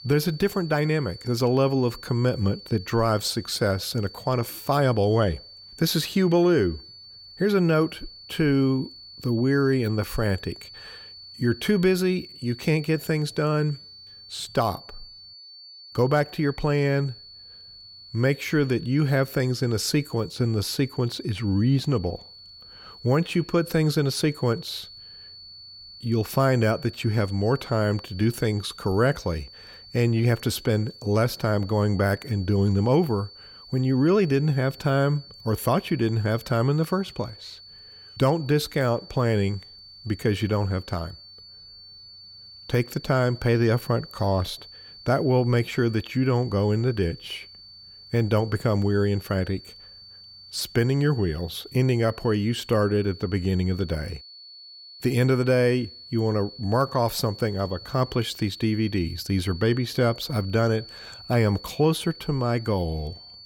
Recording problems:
high-pitched whine; noticeable; throughout; 4.5 kHz, 20 dB below the speech

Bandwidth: 16.5 kHz